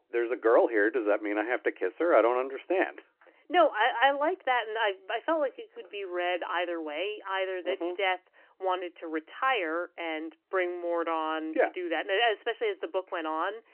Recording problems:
phone-call audio; nothing above 3 kHz
uneven, jittery; strongly; from 3 to 12 s

